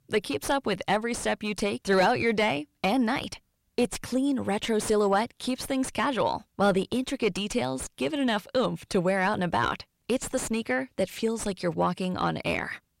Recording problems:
distortion; slight; 9 dB below the speech

